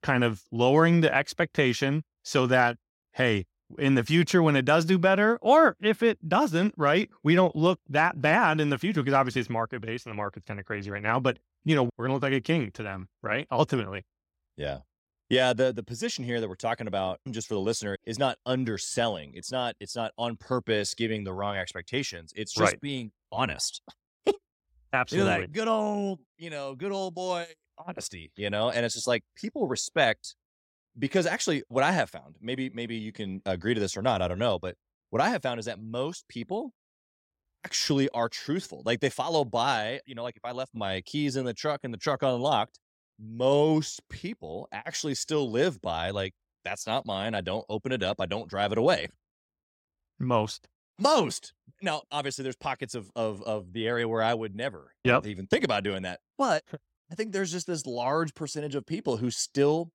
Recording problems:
none

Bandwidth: 16 kHz